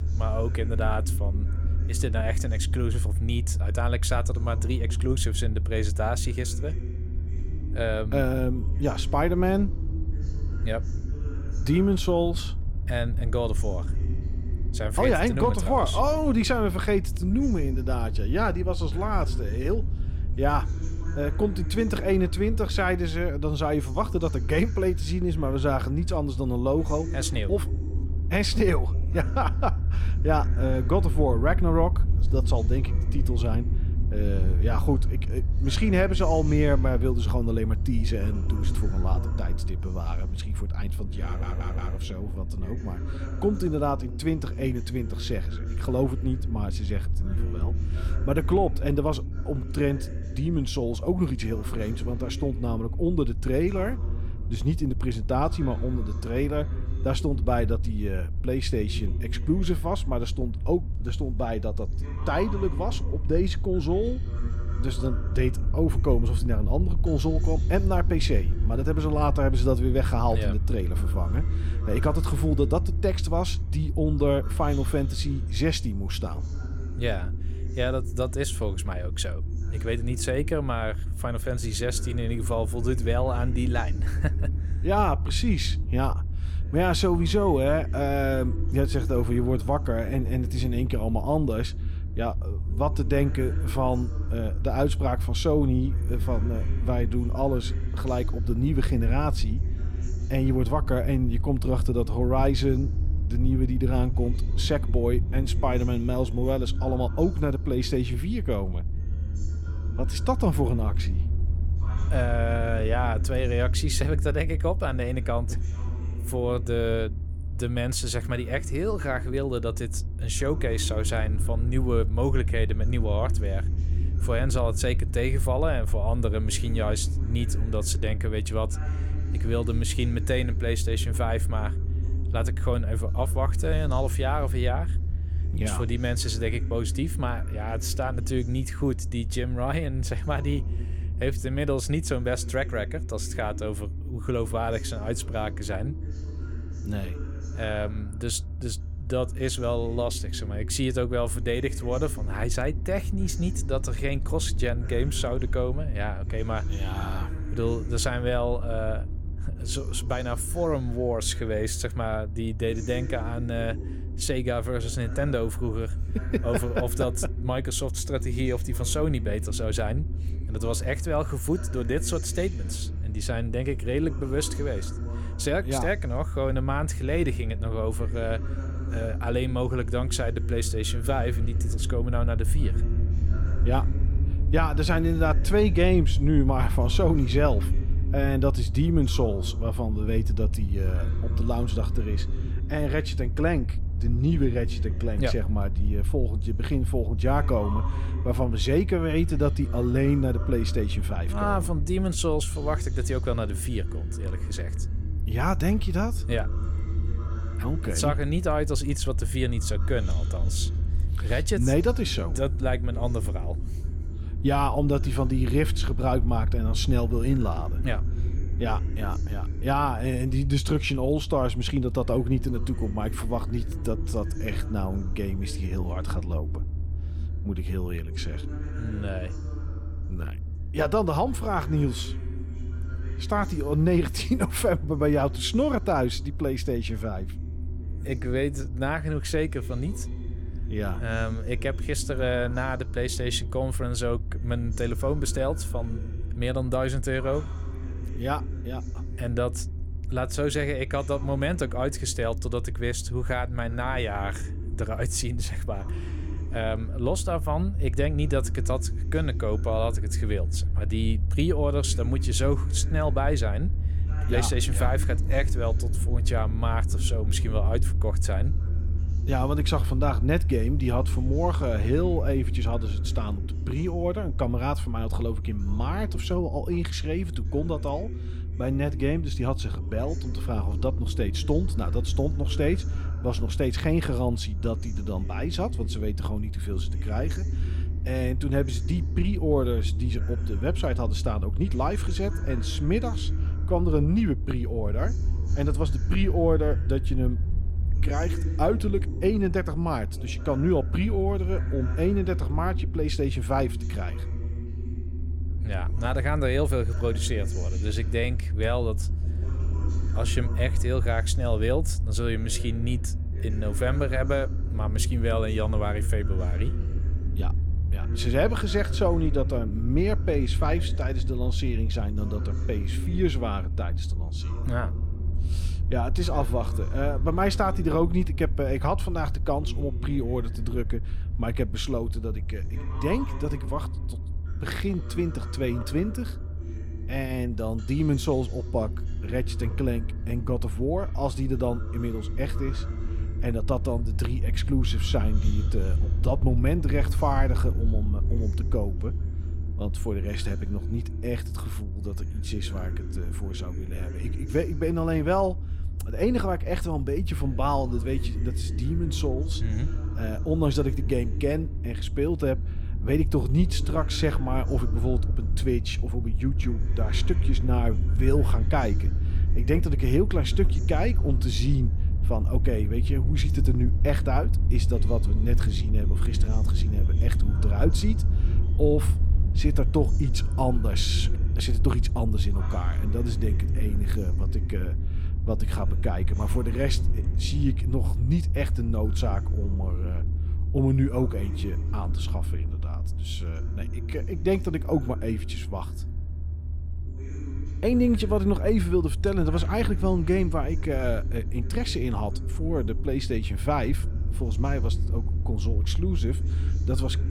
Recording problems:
voice in the background; noticeable; throughout; 15 dB below the speech
low rumble; noticeable; throughout; 15 dB below the speech
electrical hum; faint; throughout; 60 Hz, 30 dB below the speech
audio stuttering; at 41 s

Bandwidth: 17.5 kHz